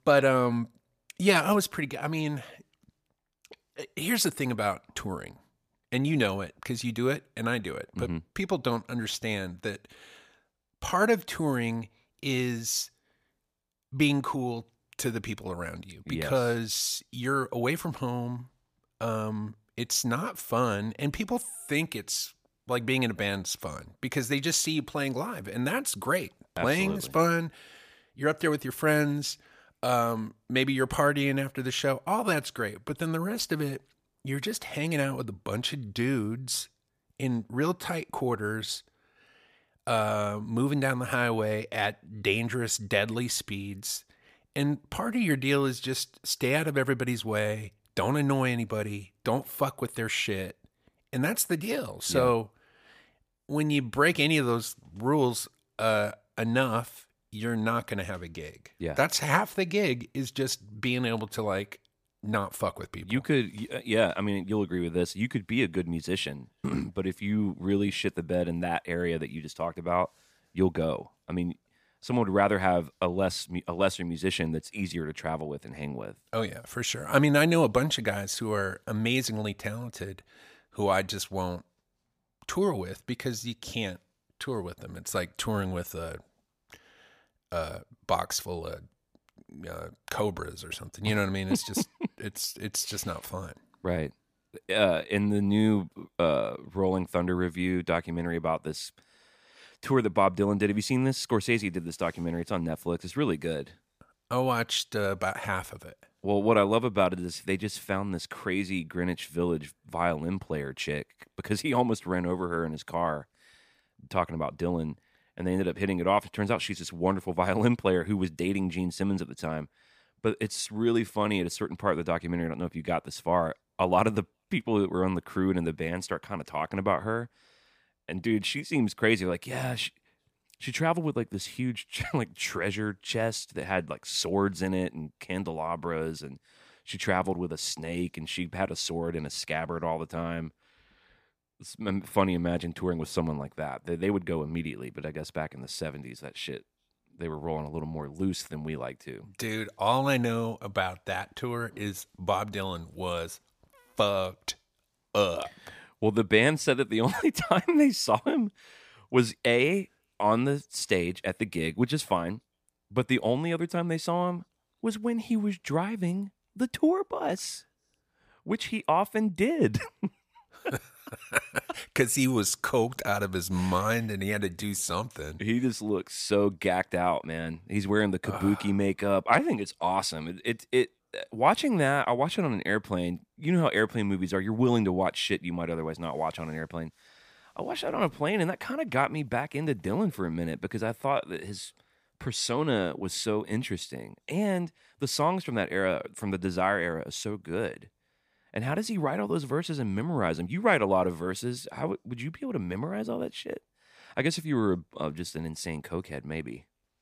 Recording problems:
none

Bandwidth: 15 kHz